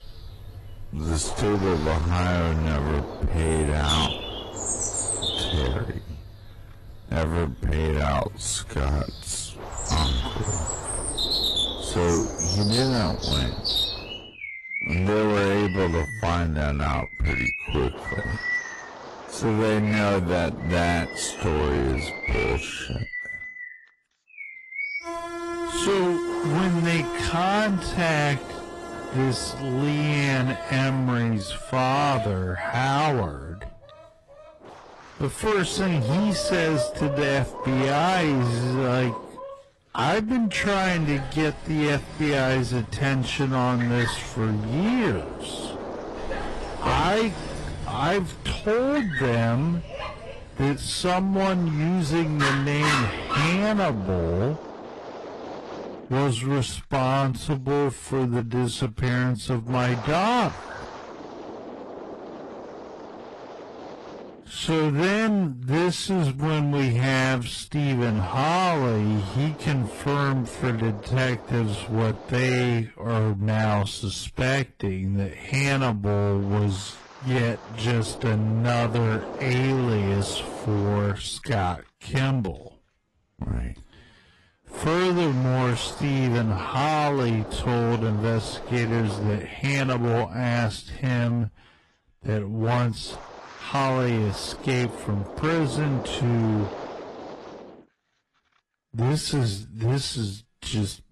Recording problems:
distortion; heavy; 17% of the sound clipped
wrong speed, natural pitch; too slow; 0.5 times normal speed
garbled, watery; slightly
animal sounds; loud; until 54 s; 6 dB below the speech
wind noise on the microphone; occasional gusts; 15 dB below the speech

